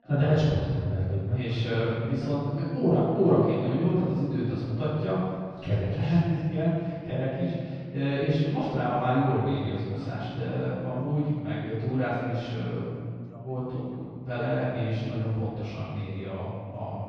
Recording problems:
room echo; strong; dies away in 1.8 s
off-mic speech; far
muffled; slightly; fading above 3.5 kHz
background chatter; faint; throughout; 2 voices, 25 dB below the speech

